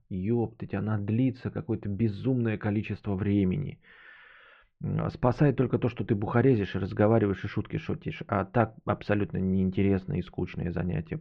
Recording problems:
muffled; very; fading above 2.5 kHz

